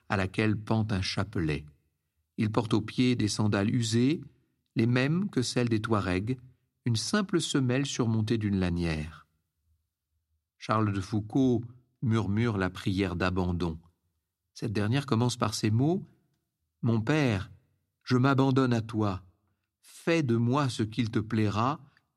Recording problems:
none

